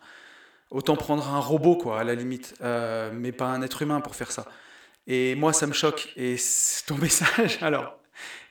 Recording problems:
echo of what is said; noticeable; throughout; 80 ms later, 15 dB below the speech

